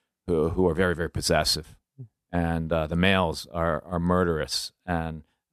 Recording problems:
none

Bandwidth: 13.5 kHz